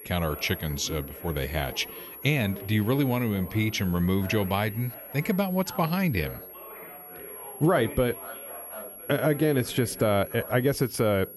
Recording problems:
high-pitched whine; noticeable; throughout; 11.5 kHz, 15 dB below the speech
background chatter; noticeable; throughout; 3 voices, 15 dB below the speech

